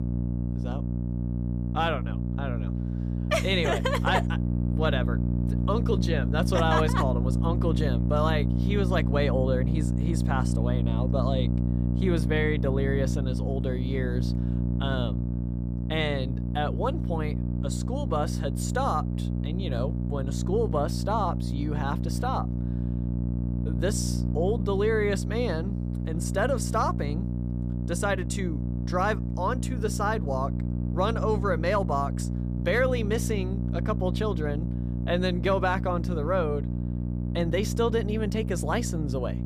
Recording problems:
electrical hum; loud; throughout; 60 Hz, 9 dB below the speech

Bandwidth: 15 kHz